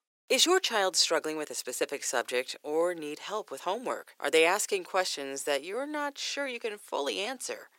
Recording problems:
thin; somewhat; fading below 350 Hz

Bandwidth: 16 kHz